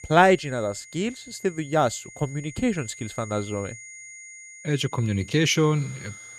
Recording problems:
high-pitched whine; noticeable; throughout; 2 kHz, 15 dB below the speech

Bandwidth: 13.5 kHz